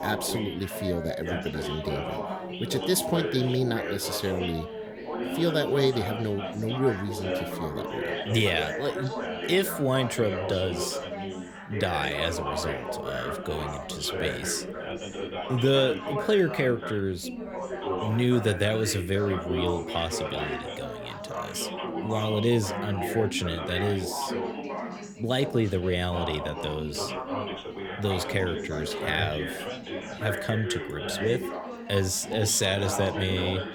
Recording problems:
background chatter; loud; throughout; 4 voices, 5 dB below the speech

